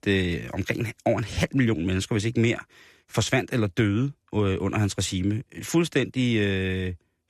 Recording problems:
none

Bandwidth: 14 kHz